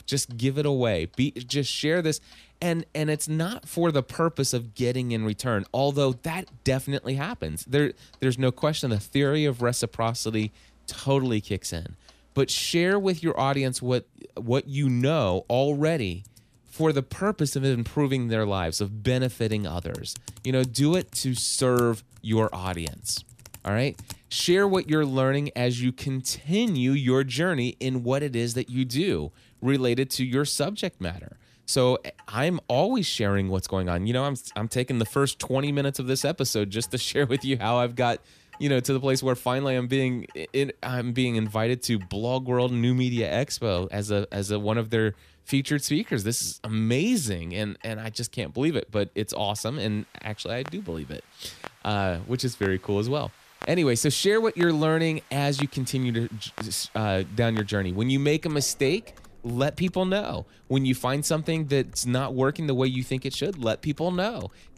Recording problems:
household noises; faint; throughout; 25 dB below the speech

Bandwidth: 14.5 kHz